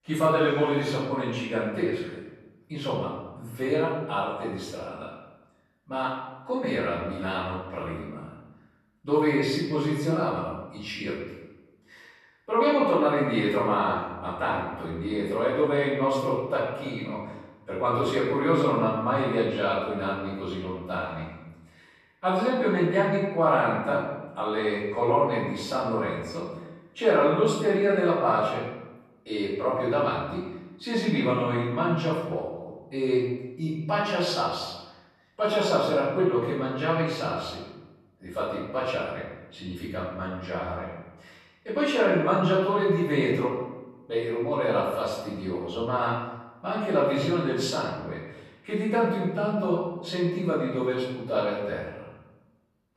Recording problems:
off-mic speech; far
room echo; noticeable; dies away in 0.9 s

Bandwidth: 13.5 kHz